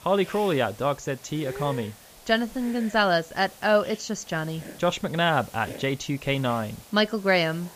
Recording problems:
high frequencies cut off; noticeable; nothing above 7.5 kHz
hiss; noticeable; throughout; 20 dB below the speech

